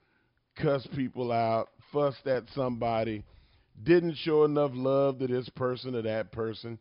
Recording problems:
high frequencies cut off; noticeable; nothing above 5.5 kHz

